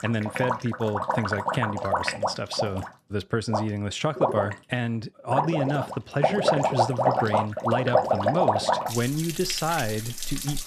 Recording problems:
rain or running water; very loud; throughout; 1 dB above the speech

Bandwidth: 14 kHz